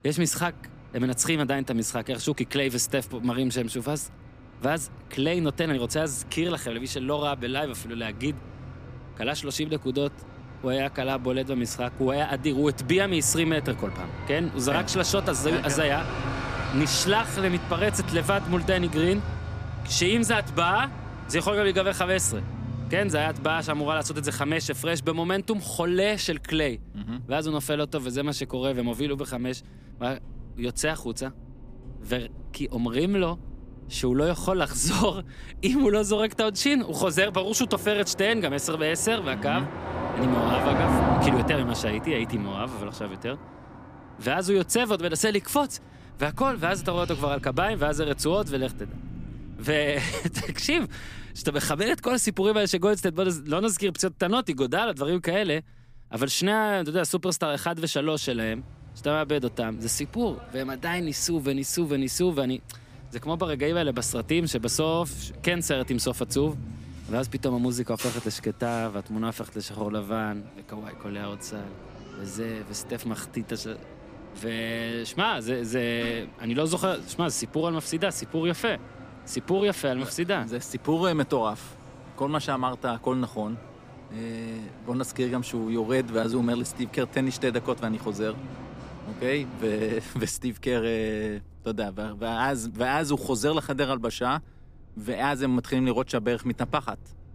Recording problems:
traffic noise; noticeable; throughout; 10 dB below the speech

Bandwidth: 15 kHz